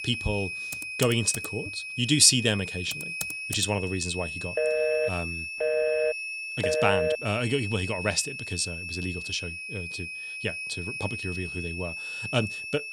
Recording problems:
high-pitched whine; loud; throughout; 2.5 kHz, 6 dB below the speech
keyboard typing; noticeable; from 0.5 to 3.5 s; peak 8 dB below the speech
phone ringing; loud; from 4.5 to 7 s; peak 2 dB above the speech

